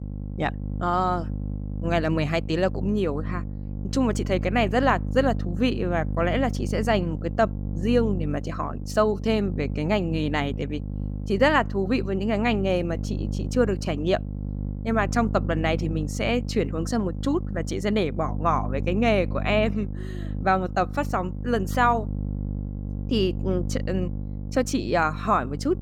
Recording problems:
electrical hum; noticeable; throughout; 50 Hz, 15 dB below the speech

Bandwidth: 17.5 kHz